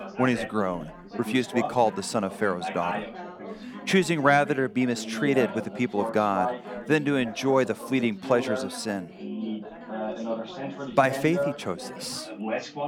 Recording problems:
background chatter; loud; throughout; 4 voices, 9 dB below the speech

